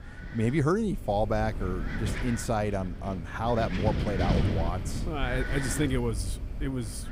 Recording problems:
wind noise on the microphone; heavy; 7 dB below the speech

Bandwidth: 15.5 kHz